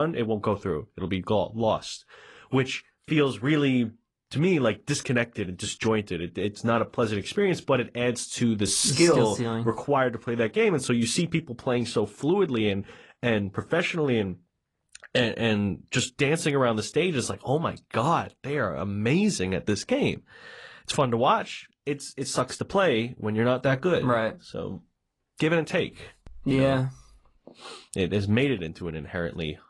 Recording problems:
garbled, watery; slightly; nothing above 10.5 kHz
abrupt cut into speech; at the start

